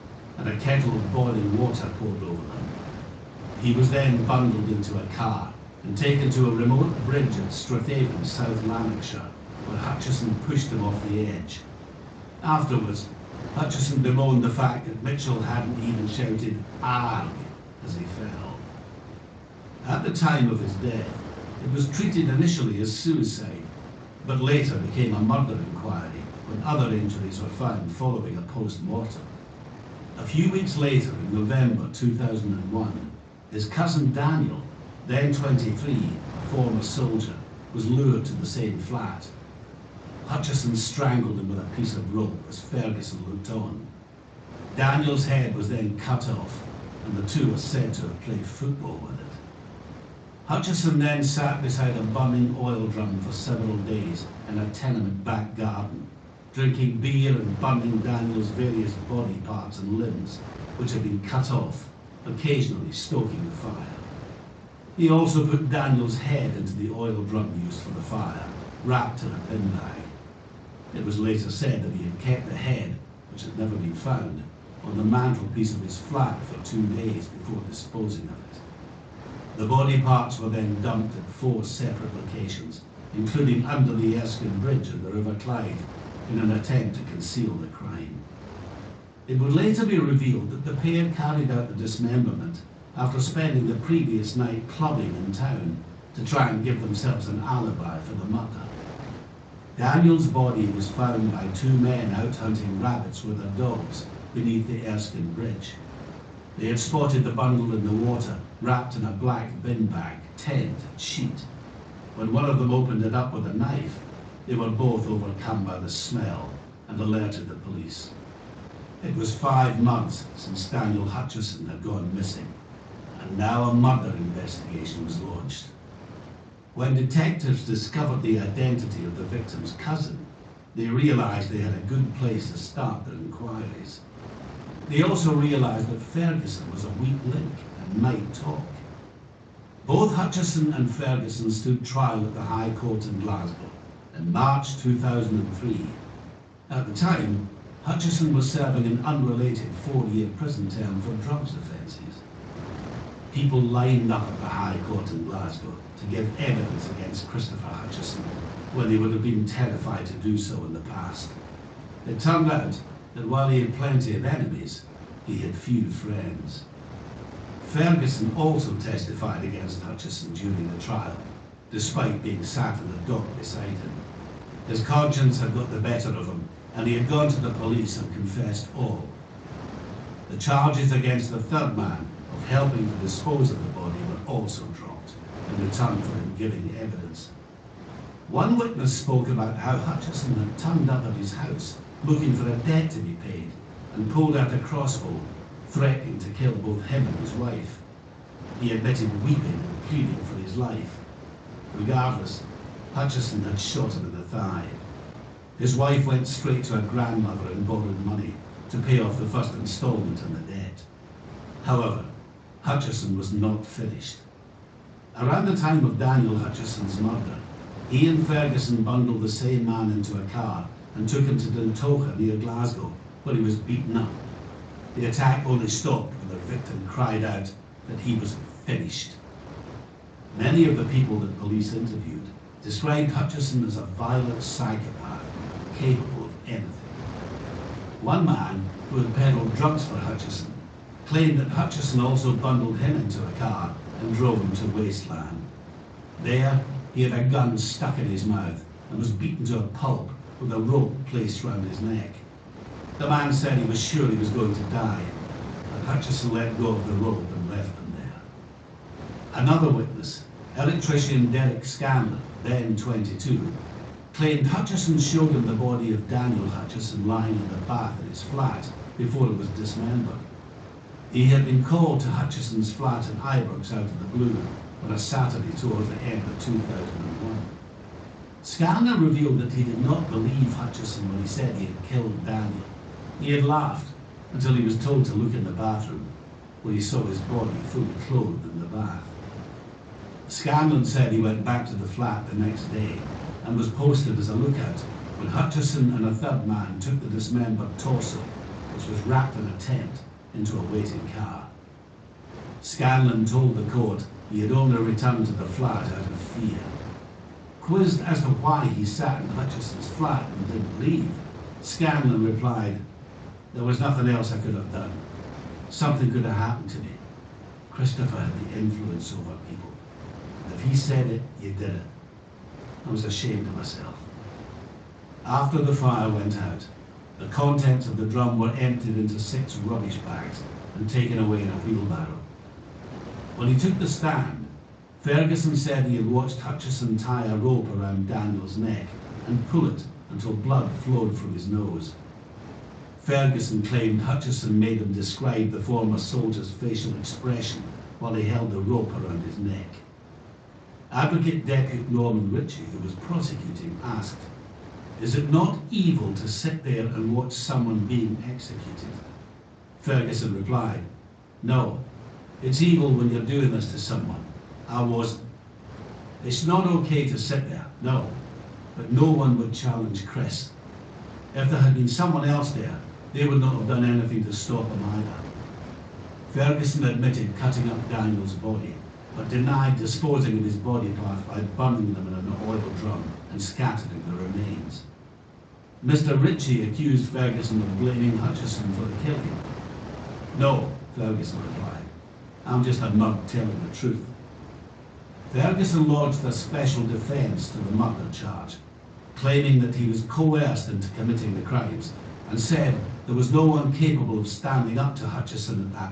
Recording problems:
off-mic speech; far
room echo; slight; dies away in 0.4 s
garbled, watery; slightly; nothing above 7.5 kHz
wind noise on the microphone; occasional gusts; 15 dB below the speech

